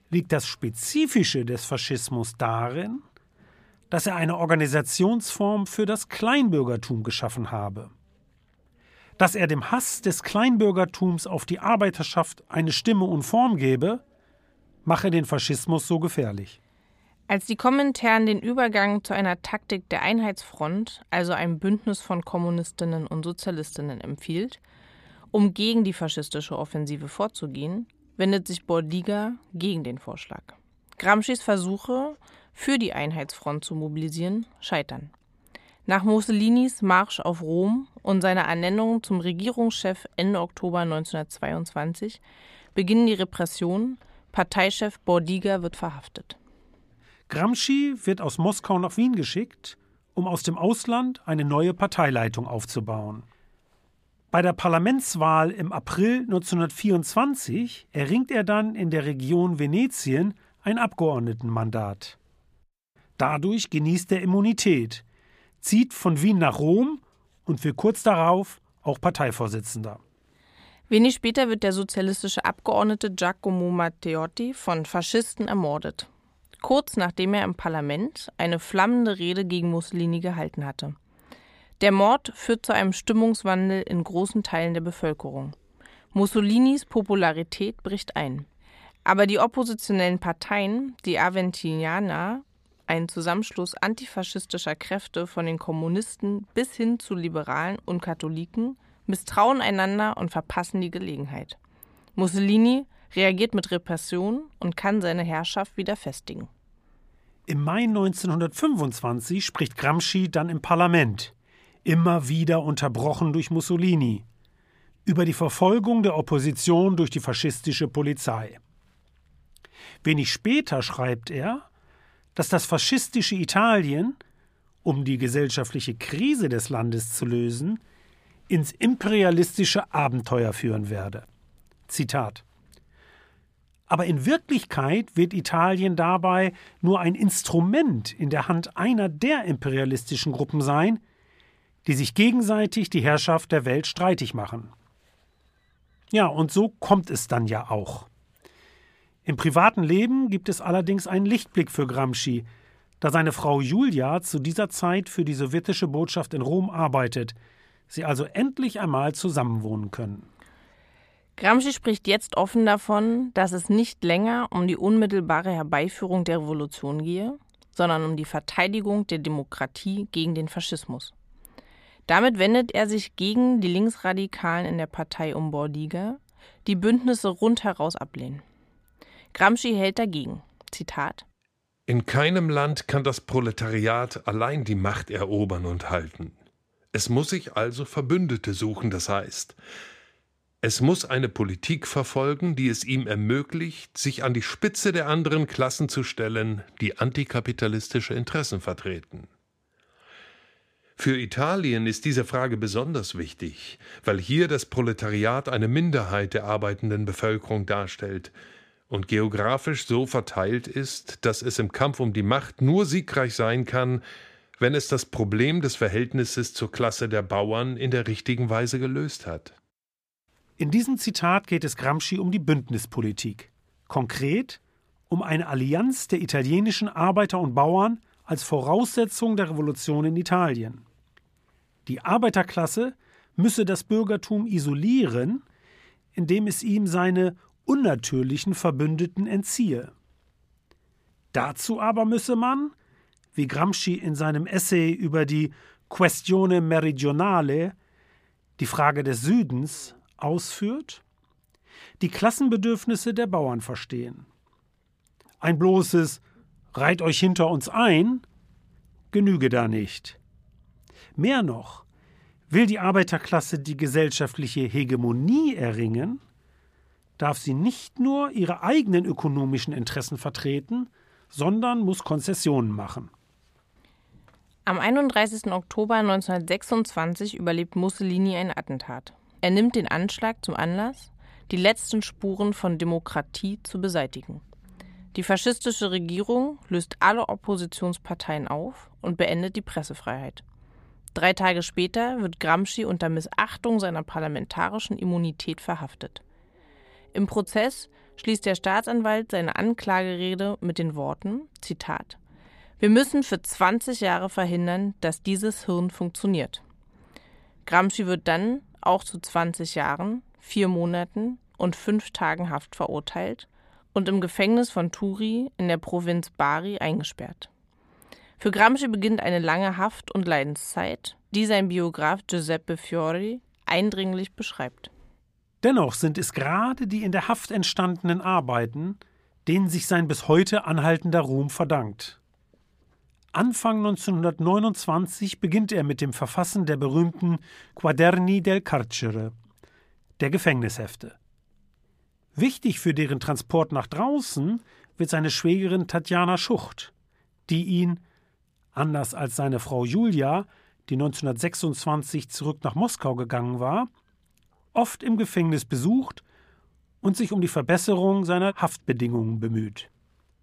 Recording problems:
none

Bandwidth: 15 kHz